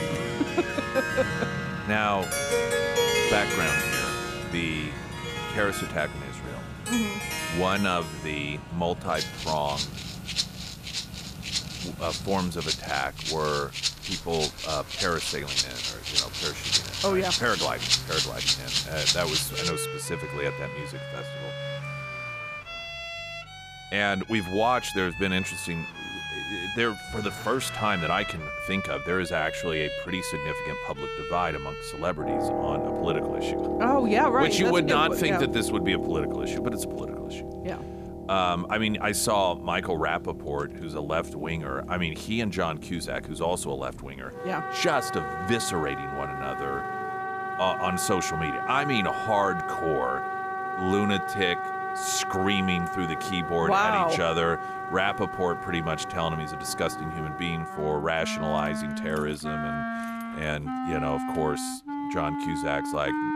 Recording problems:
background music; loud; throughout; 2 dB below the speech
traffic noise; noticeable; throughout; 15 dB below the speech

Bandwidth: 14.5 kHz